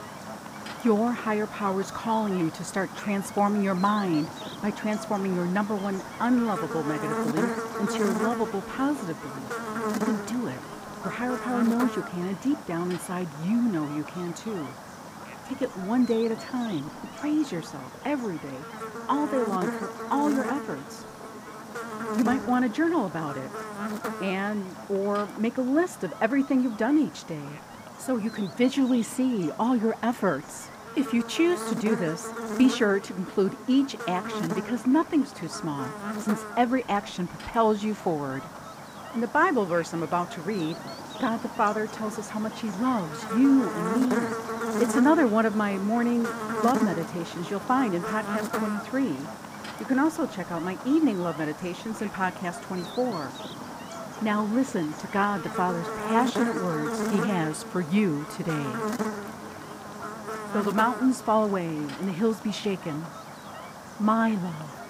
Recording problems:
muffled; slightly; fading above 3.5 kHz
electrical hum; loud; throughout; 50 Hz, 7 dB below the speech

